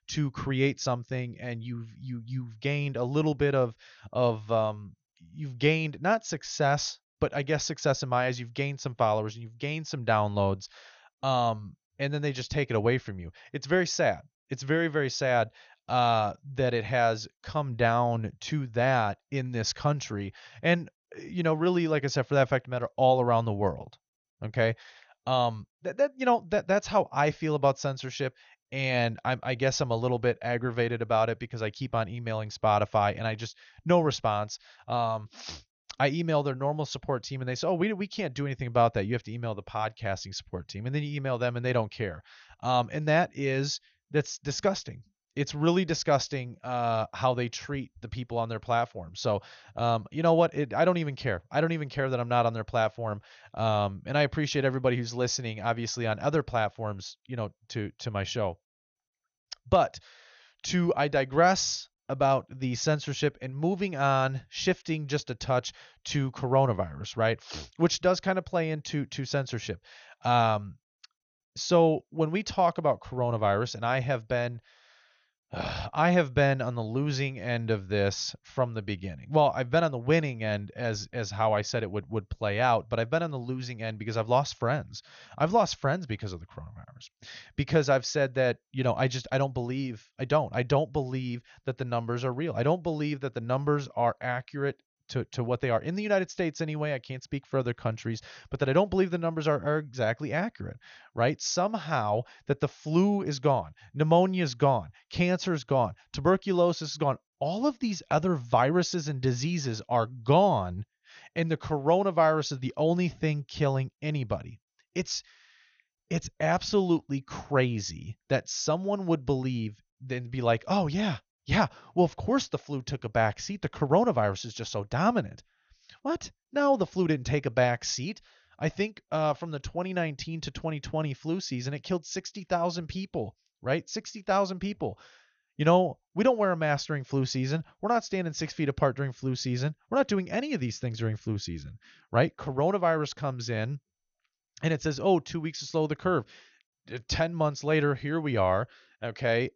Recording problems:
garbled, watery; slightly; nothing above 6.5 kHz

